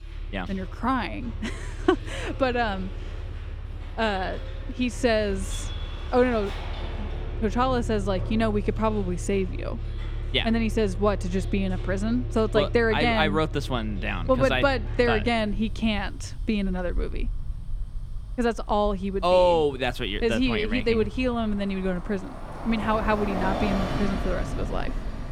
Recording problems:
traffic noise; loud; throughout; 9 dB below the speech

